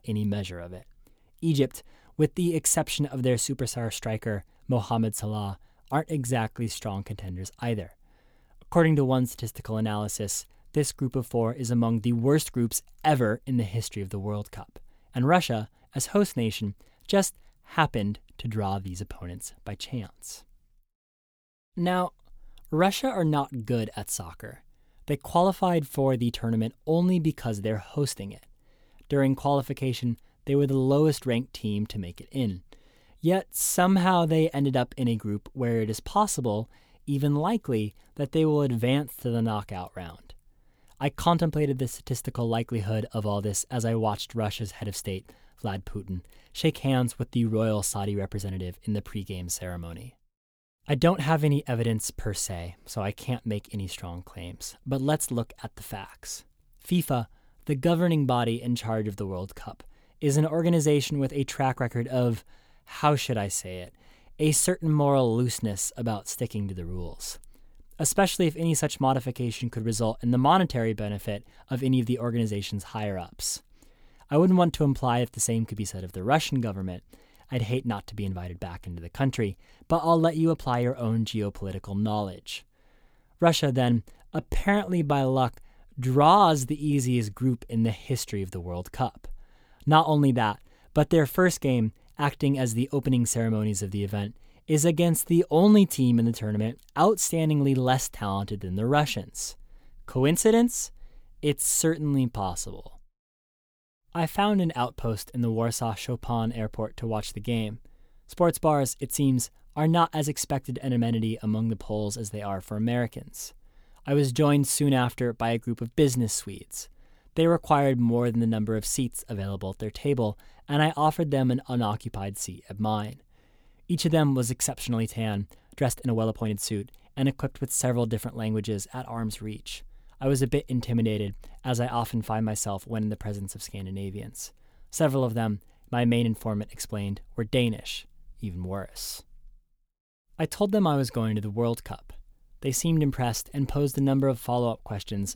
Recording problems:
uneven, jittery; strongly; from 6 s to 2:07

